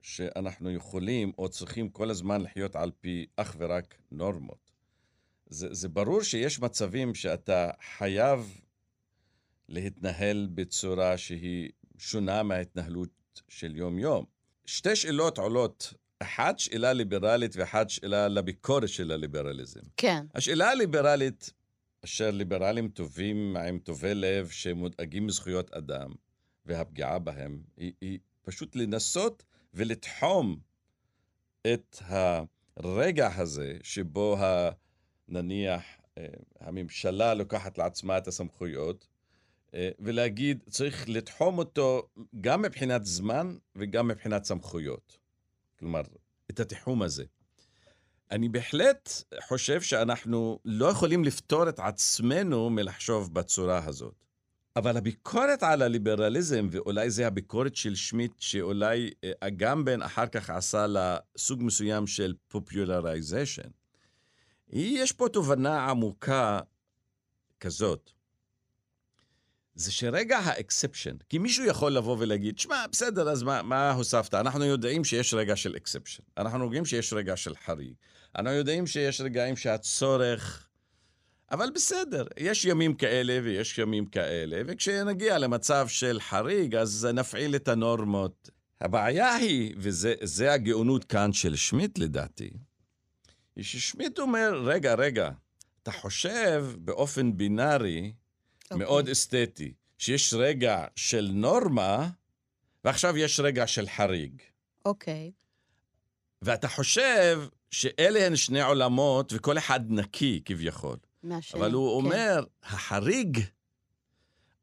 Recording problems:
none

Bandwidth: 15 kHz